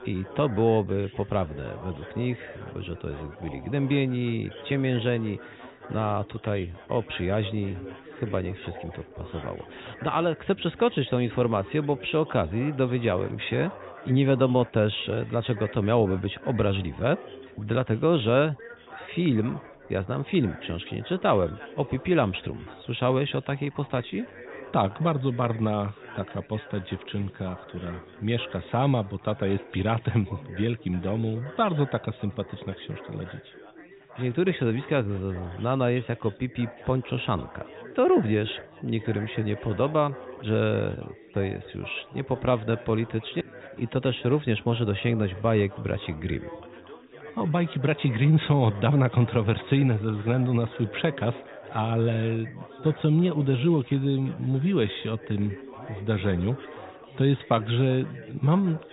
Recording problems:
high frequencies cut off; severe; nothing above 4 kHz
chatter from many people; noticeable; throughout; 15 dB below the speech

